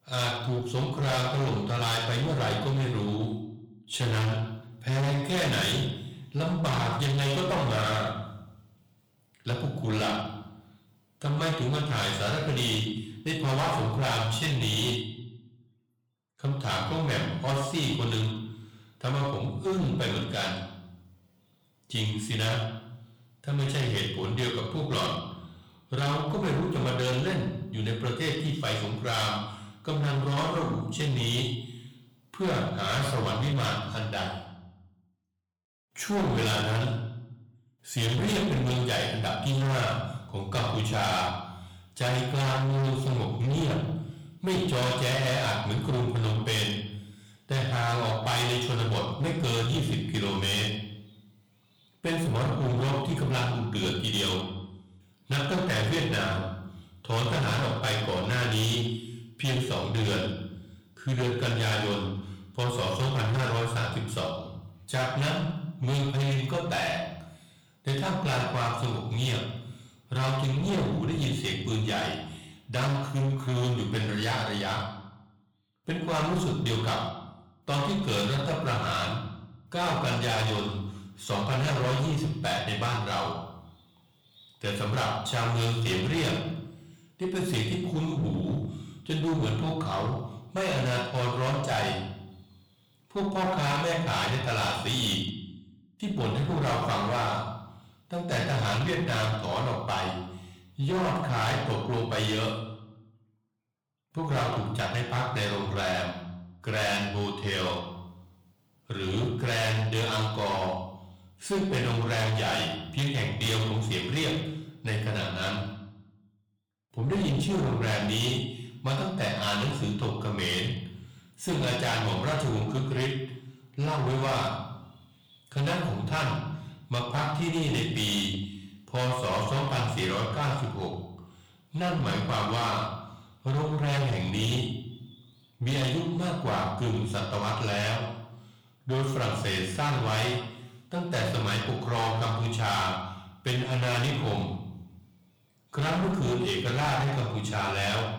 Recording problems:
distortion; heavy; 21% of the sound clipped
room echo; slight; dies away in 0.7 s
off-mic speech; somewhat distant

